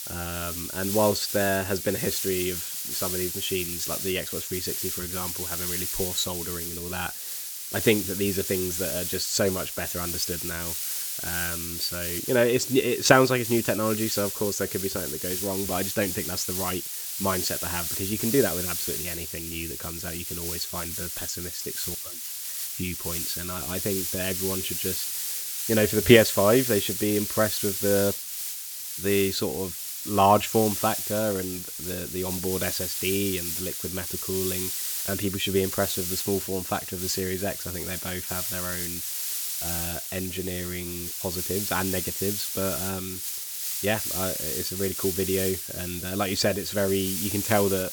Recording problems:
hiss; loud; throughout; 1 dB below the speech

